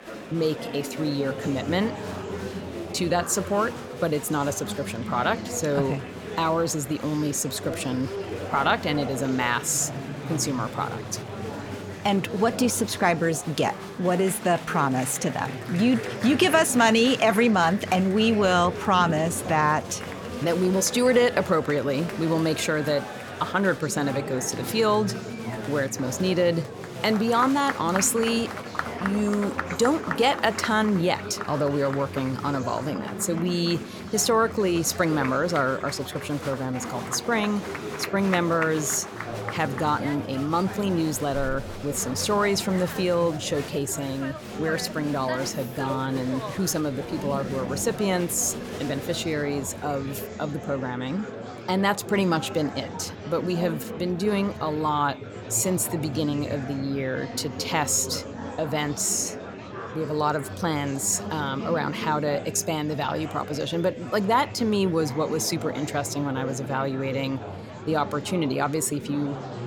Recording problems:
murmuring crowd; loud; throughout; 9 dB below the speech

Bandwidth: 17.5 kHz